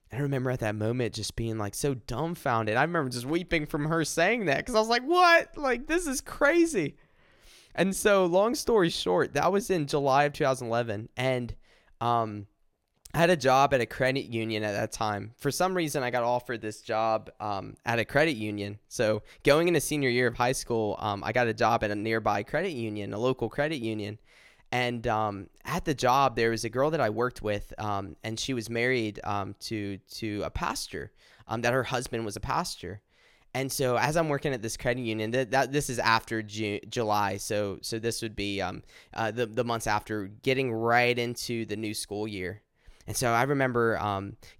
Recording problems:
none

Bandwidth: 16.5 kHz